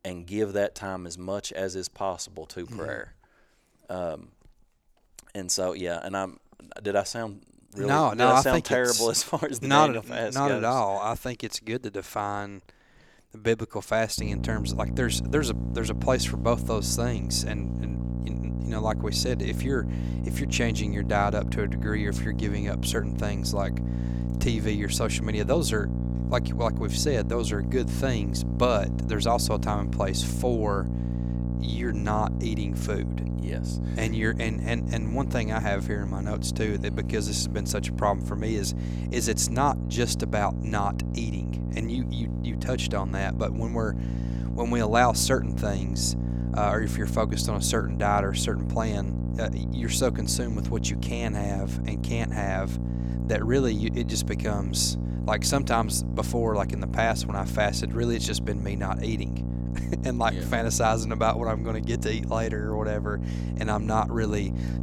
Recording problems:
electrical hum; noticeable; from 14 s on; 60 Hz, 10 dB below the speech

